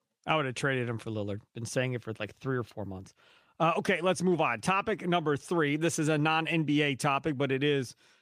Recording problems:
none

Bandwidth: 15 kHz